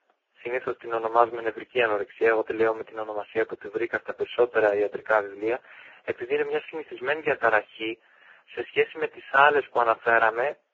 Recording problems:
phone-call audio; poor line; nothing above 7.5 kHz
garbled, watery; badly
thin; very; fading below 300 Hz

